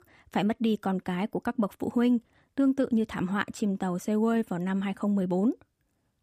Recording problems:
none

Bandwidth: 15 kHz